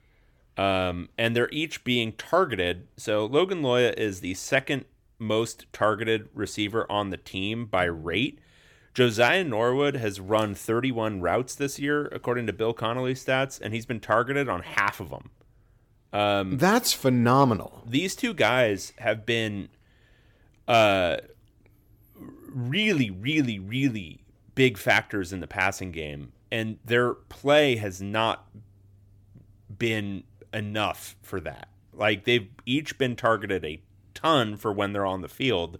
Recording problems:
none

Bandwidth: 18 kHz